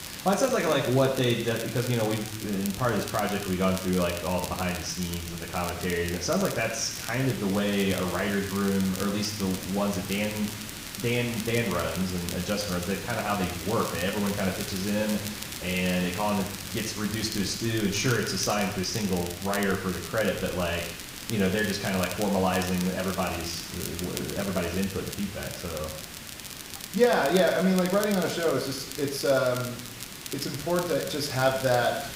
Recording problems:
room echo; noticeable; dies away in 0.8 s
off-mic speech; somewhat distant
hiss; noticeable; throughout; 10 dB below the speech
crackle, like an old record; noticeable; 10 dB below the speech

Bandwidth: 15.5 kHz